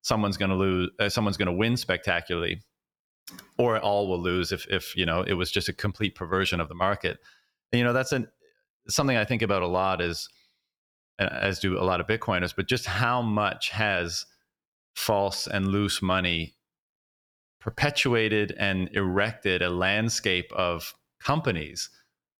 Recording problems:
none

